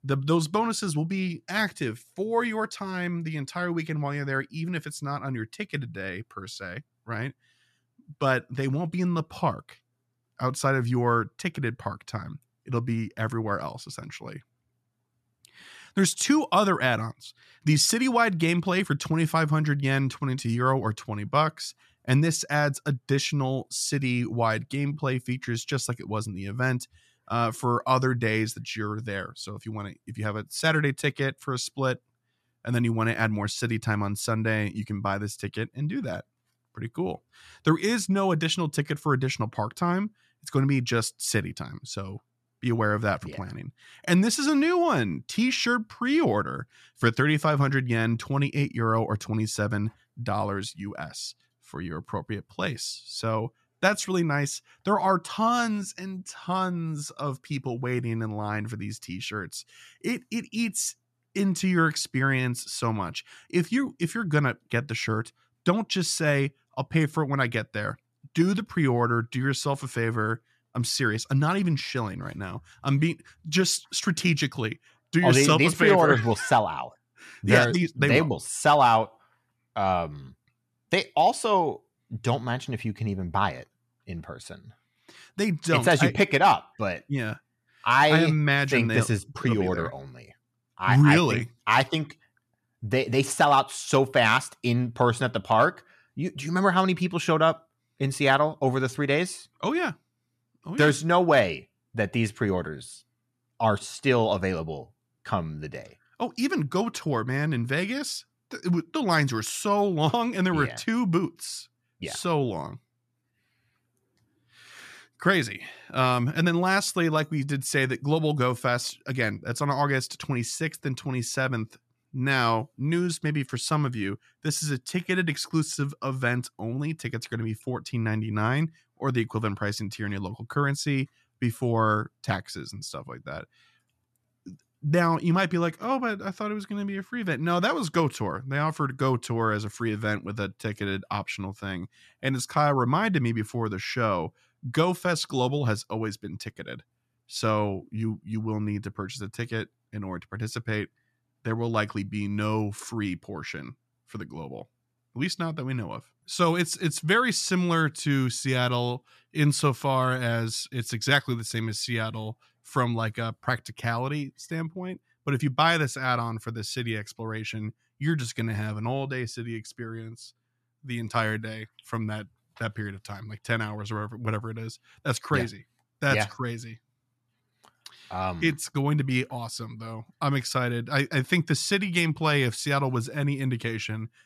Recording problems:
none

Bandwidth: 13.5 kHz